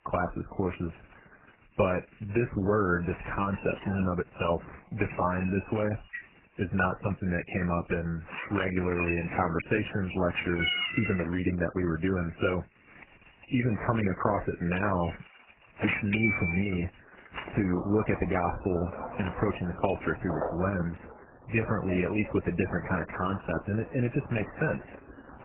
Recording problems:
garbled, watery; badly; nothing above 3 kHz
animal sounds; loud; throughout; 7 dB below the speech

